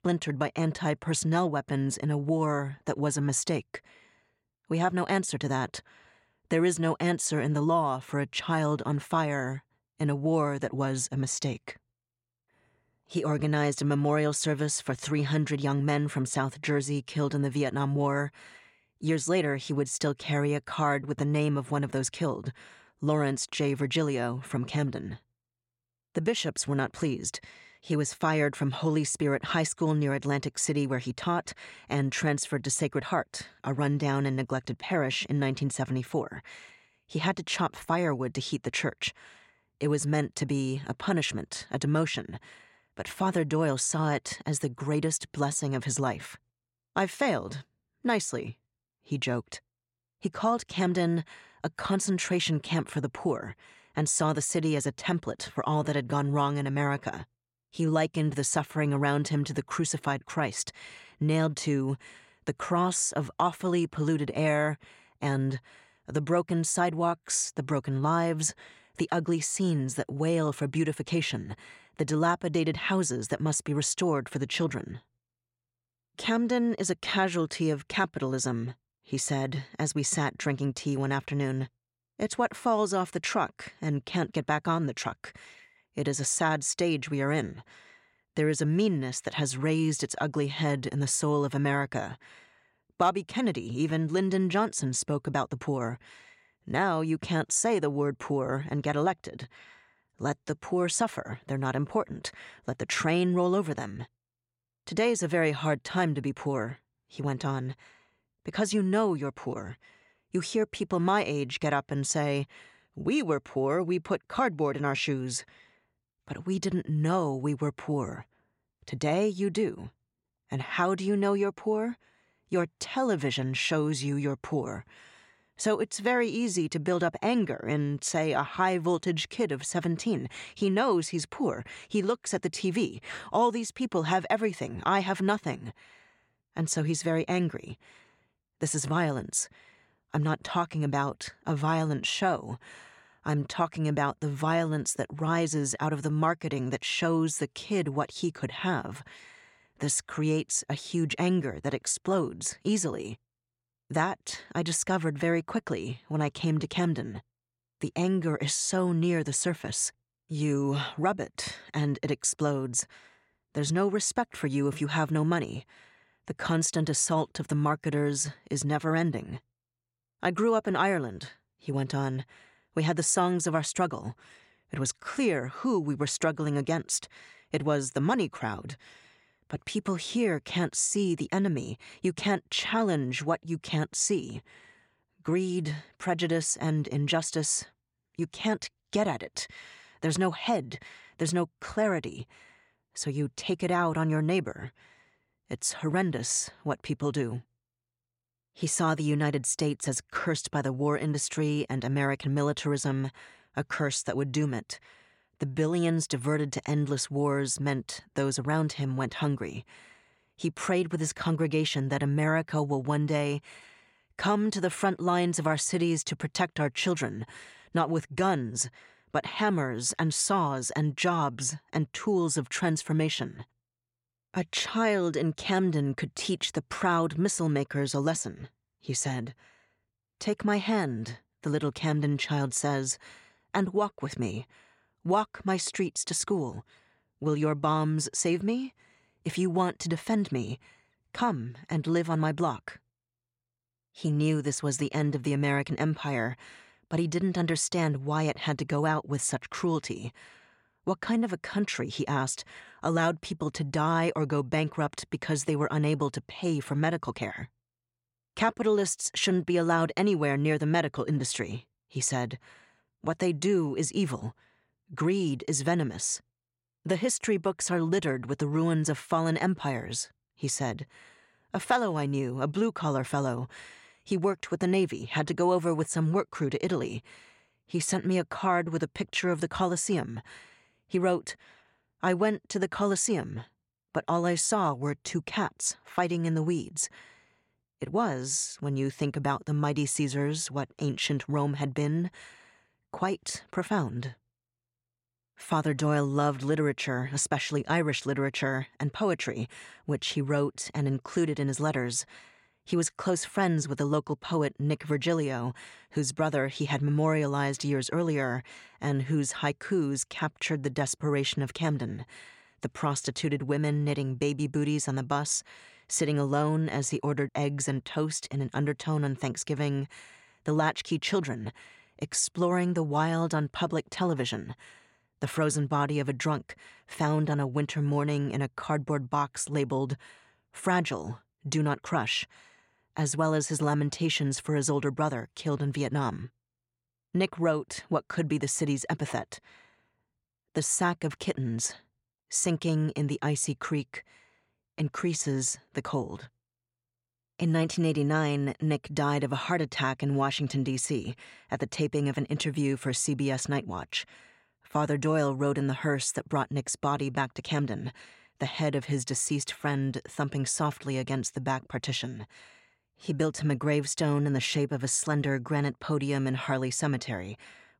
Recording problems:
none

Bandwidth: 16 kHz